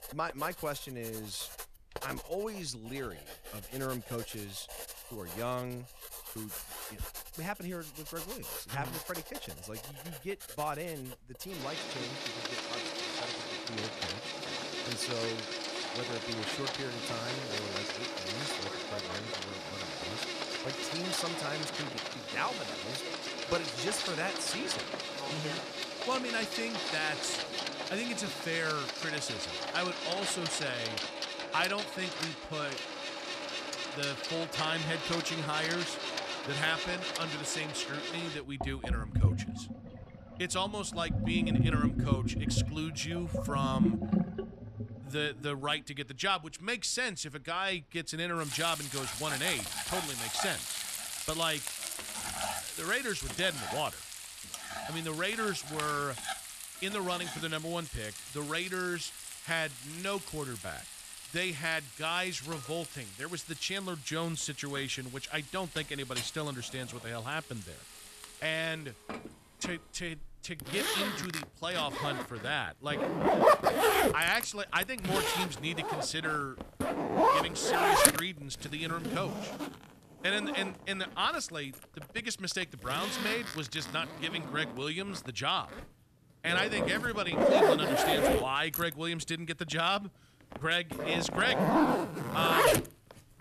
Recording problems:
household noises; very loud; throughout; 1 dB above the speech

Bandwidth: 14.5 kHz